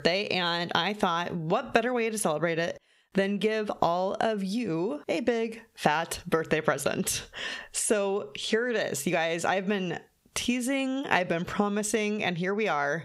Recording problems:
squashed, flat; heavily

